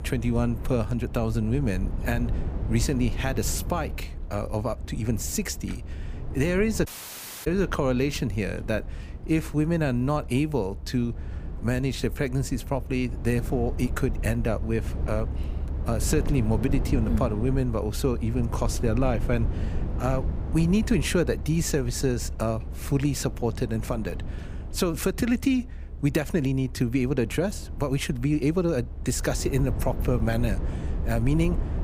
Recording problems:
low rumble; noticeable; throughout; 15 dB below the speech
audio cutting out; at 7 s for 0.5 s

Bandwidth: 15 kHz